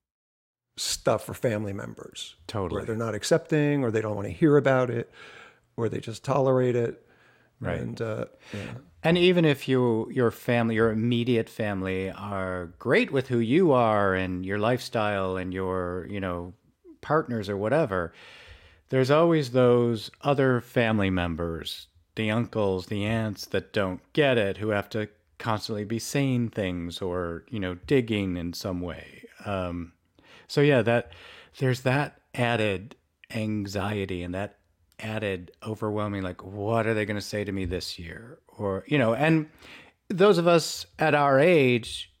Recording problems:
none

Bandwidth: 16 kHz